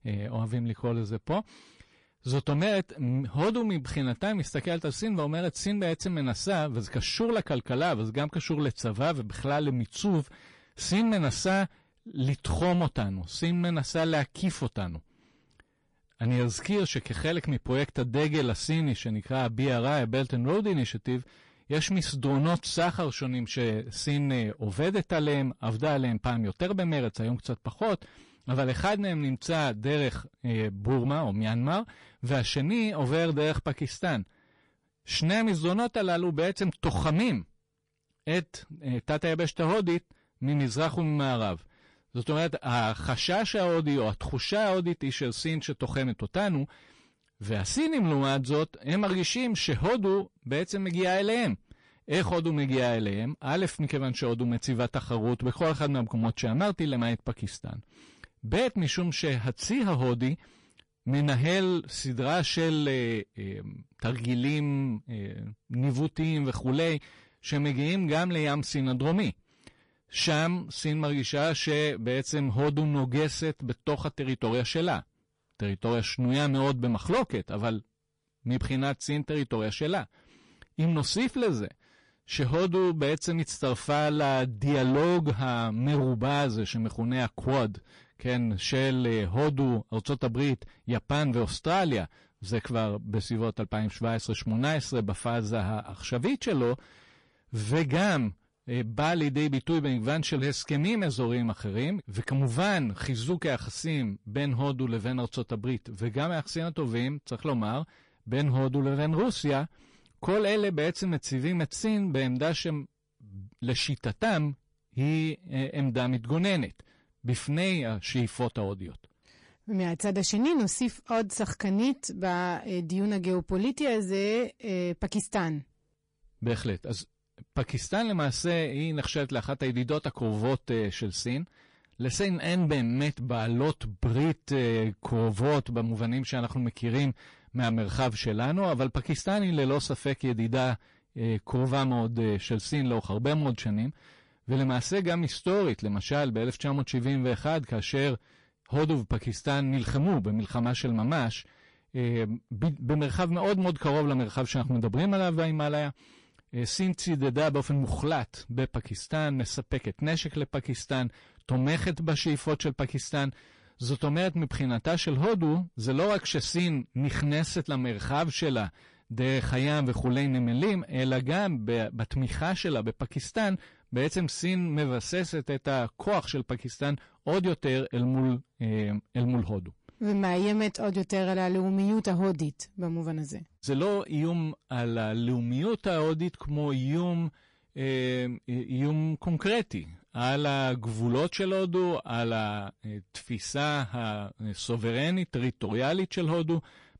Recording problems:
distortion; slight; 10 dB below the speech
garbled, watery; slightly; nothing above 10.5 kHz

